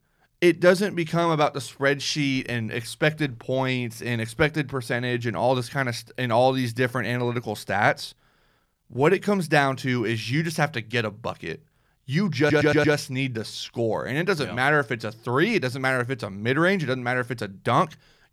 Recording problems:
audio stuttering; at 12 s

